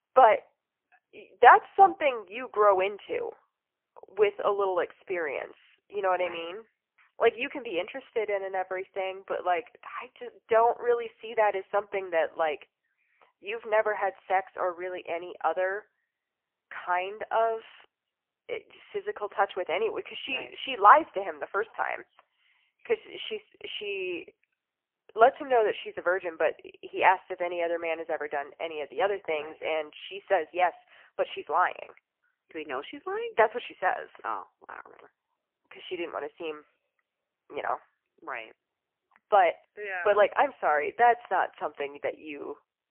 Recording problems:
phone-call audio; poor line; nothing above 3 kHz

